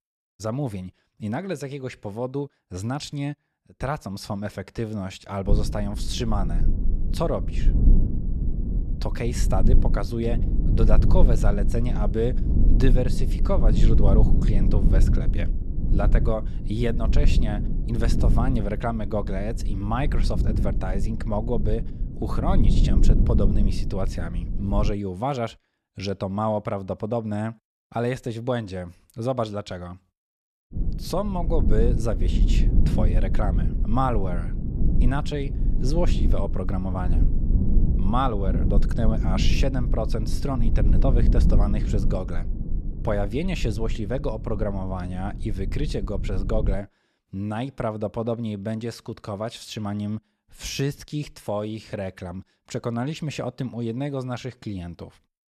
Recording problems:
low rumble; loud; from 5.5 to 25 s and from 31 to 47 s; 8 dB below the speech

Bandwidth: 13.5 kHz